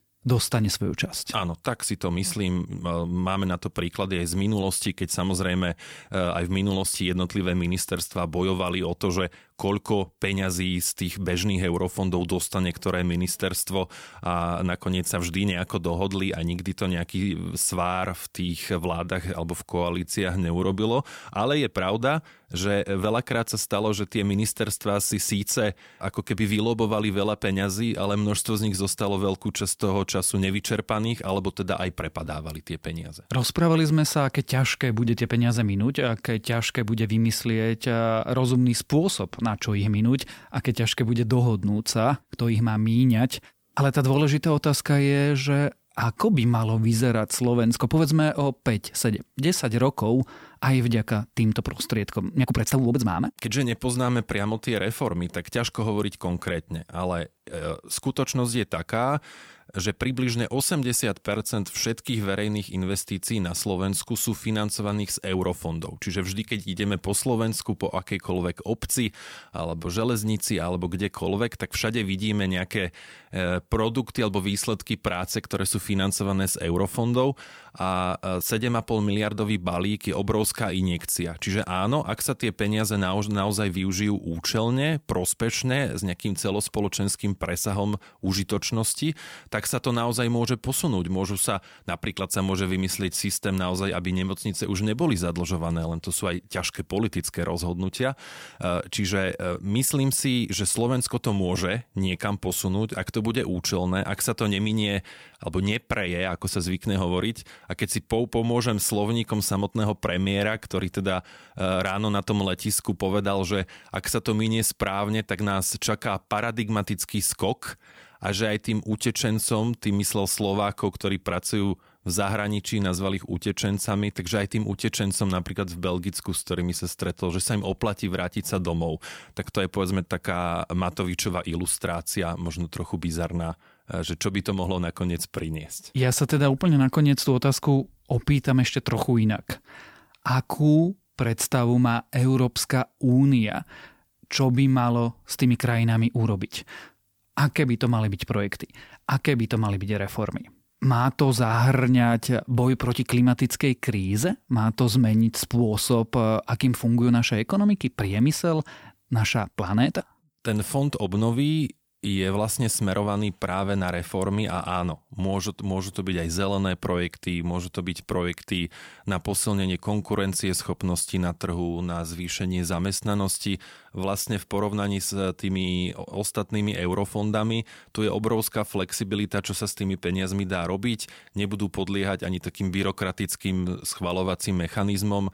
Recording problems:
uneven, jittery; strongly; from 20 s to 2:40

